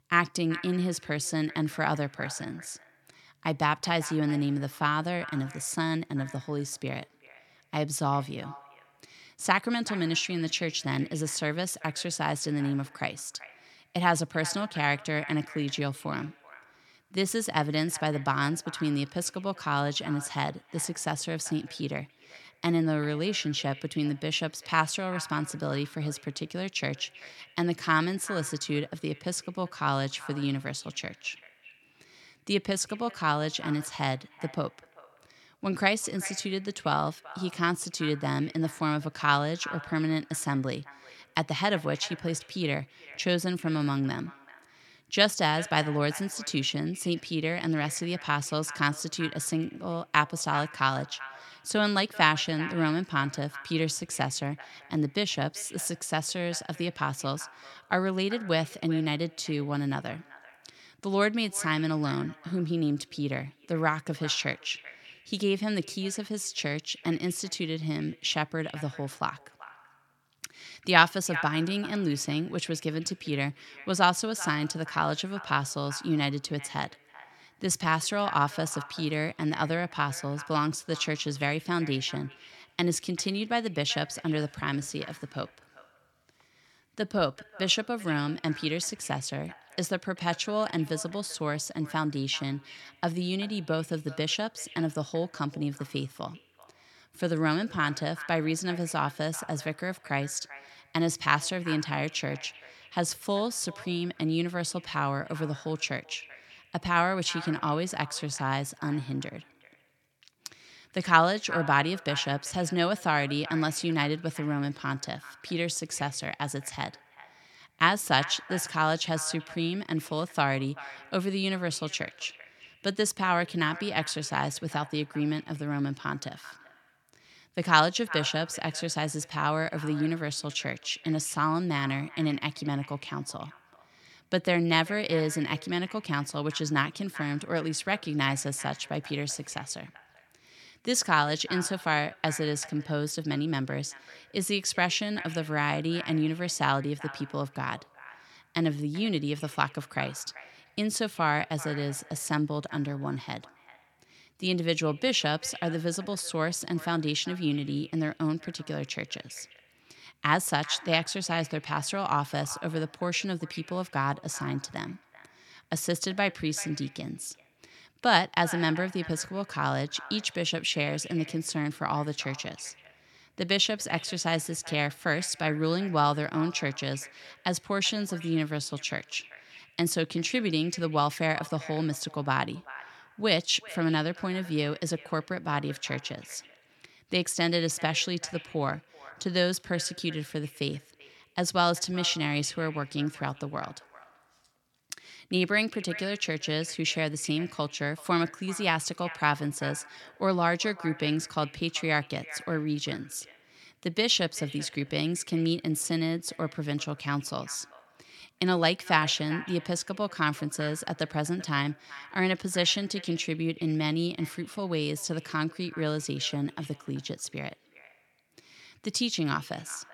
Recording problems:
echo of what is said; noticeable; throughout; 390 ms later, 15 dB below the speech

